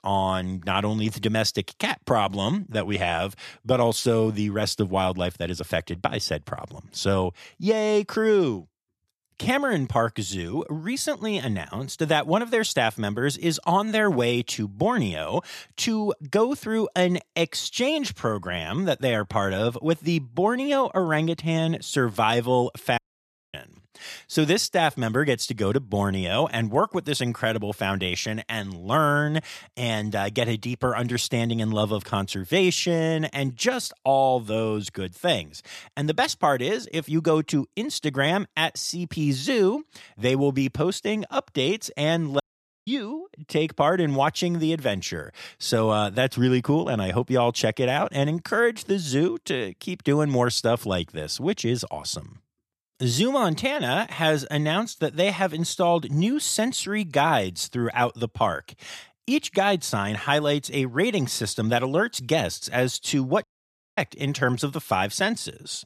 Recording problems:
audio cutting out; at 23 s for 0.5 s, at 42 s and at 1:03 for 0.5 s

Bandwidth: 13.5 kHz